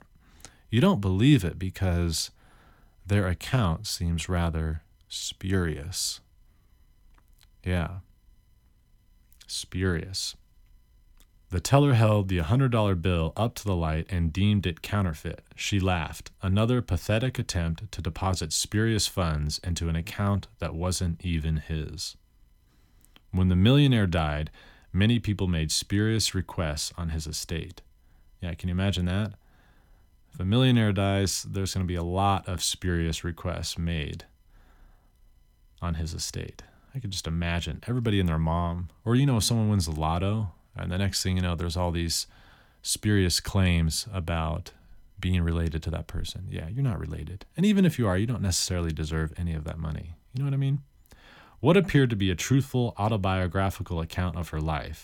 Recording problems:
none

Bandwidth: 17 kHz